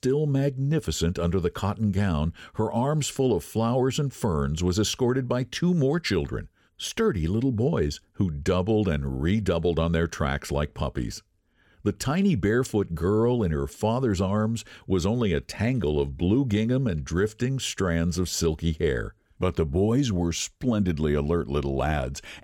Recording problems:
none

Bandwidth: 17 kHz